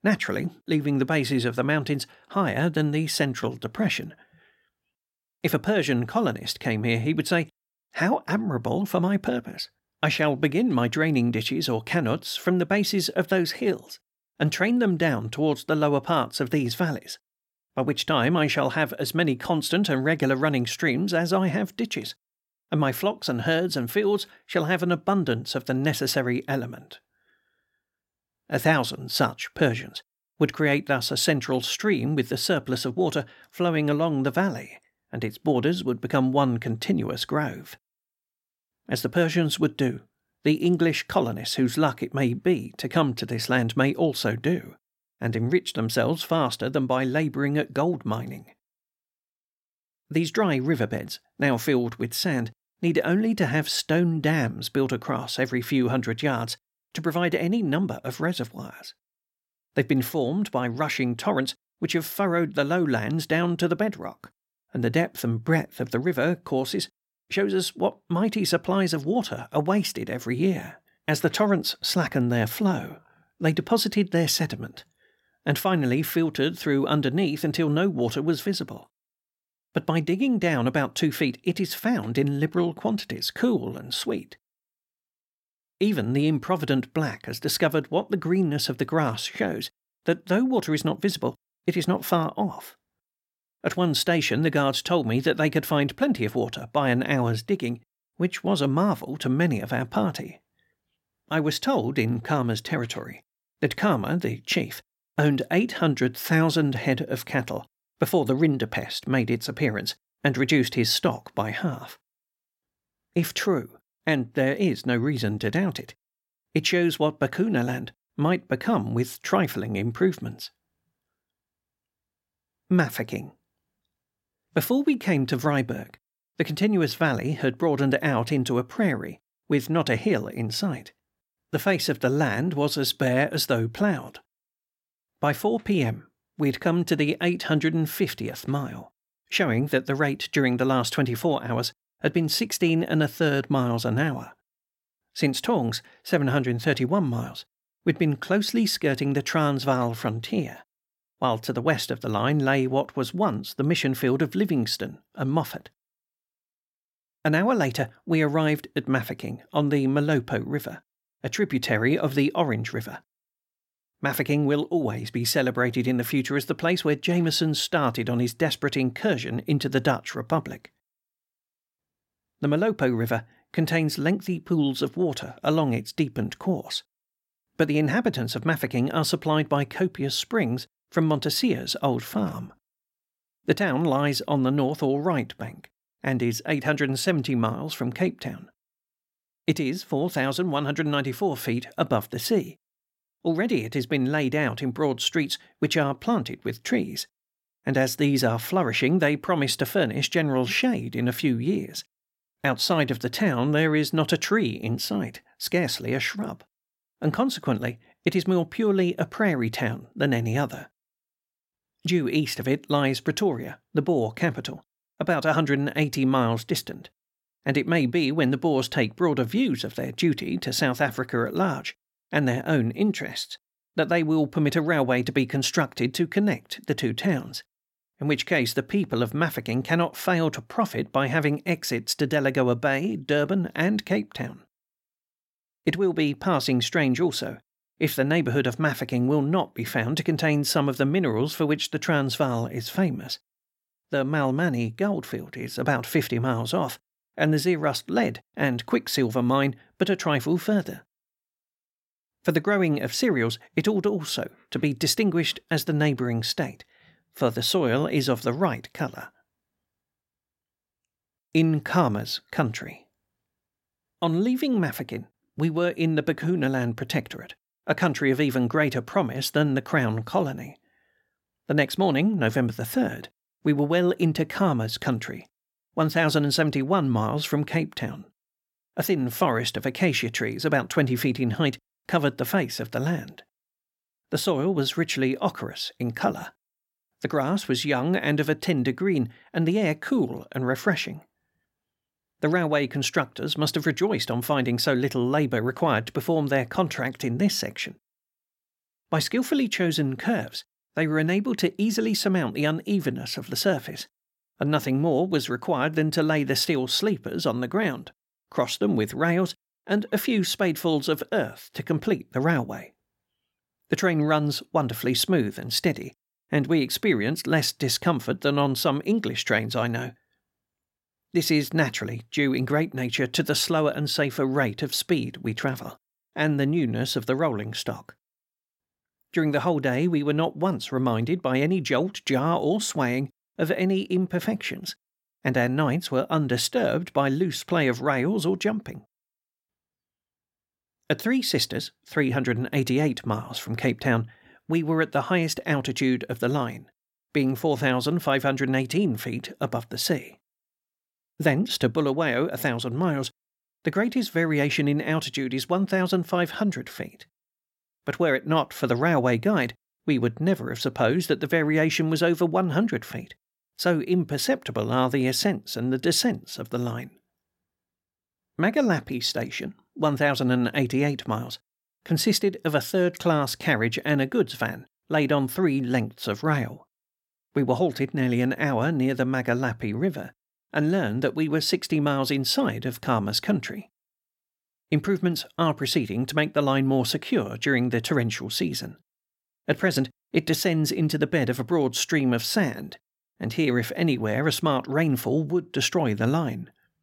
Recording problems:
none

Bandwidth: 16.5 kHz